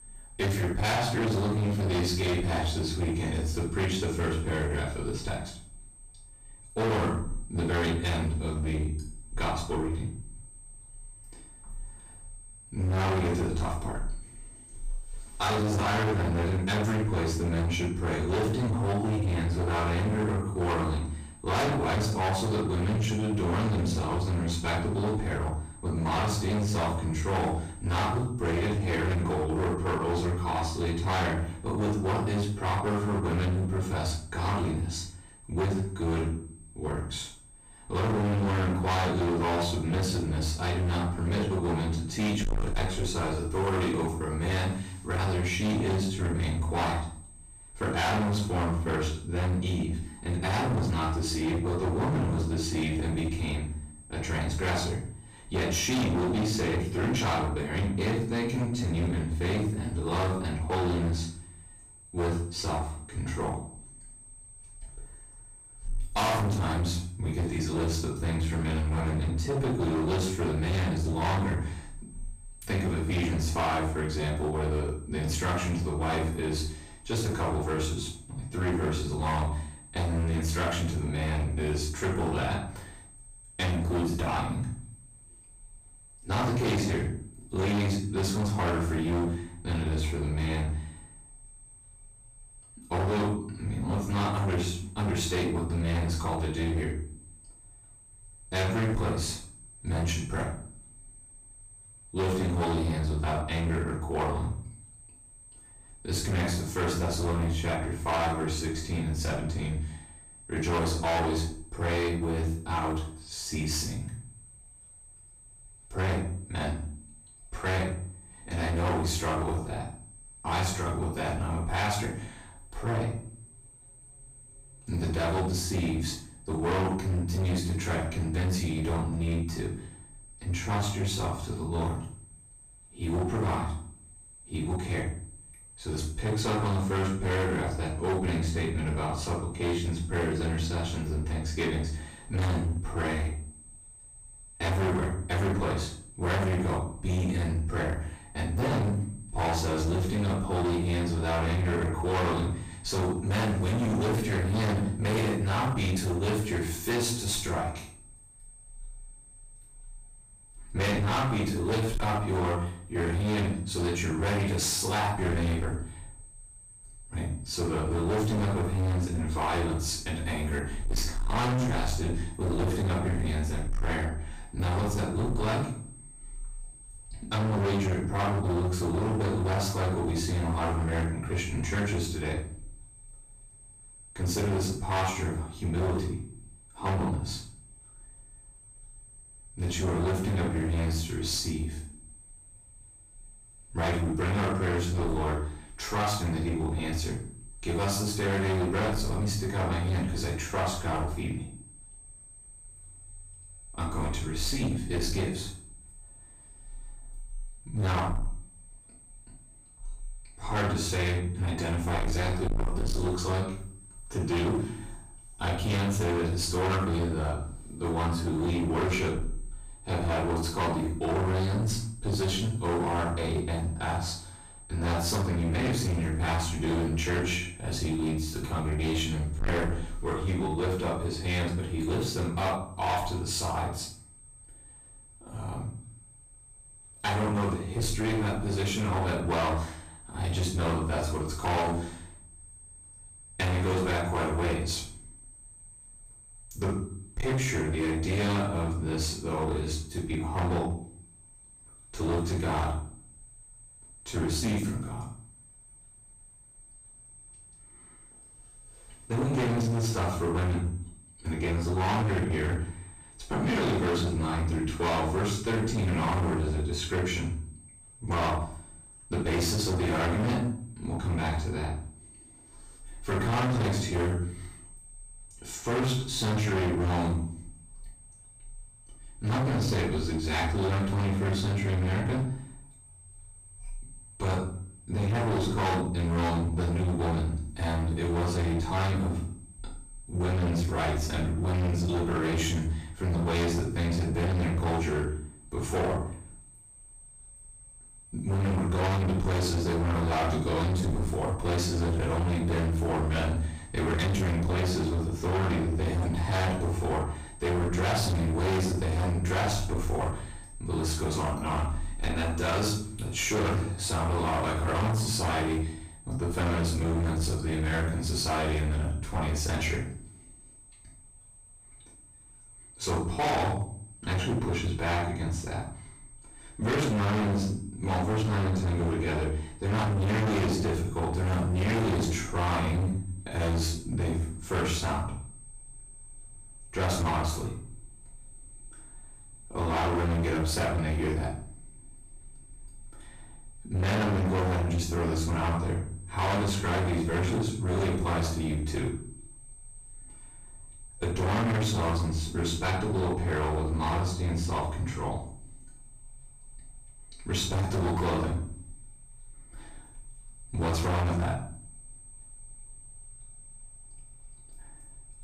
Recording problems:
distortion; heavy; 21% of the sound clipped
off-mic speech; far
room echo; noticeable; dies away in 0.5 s
high-pitched whine; faint; throughout; 8.5 kHz, 20 dB below the speech

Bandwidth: 15 kHz